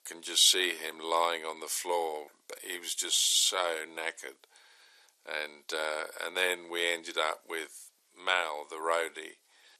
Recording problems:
thin; very; fading below 400 Hz

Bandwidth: 13.5 kHz